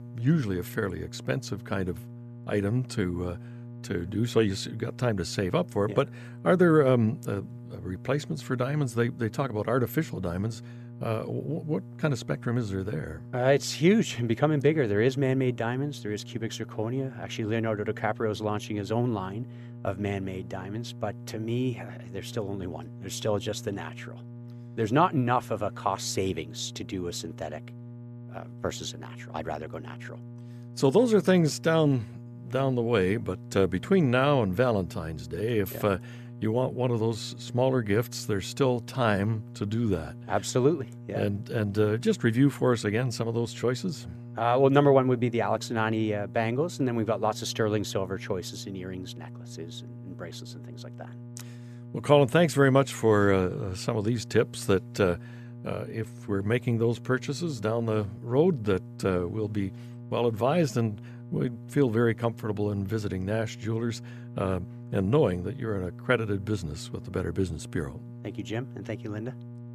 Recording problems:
electrical hum; faint; throughout; 60 Hz, 20 dB below the speech

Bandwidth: 14 kHz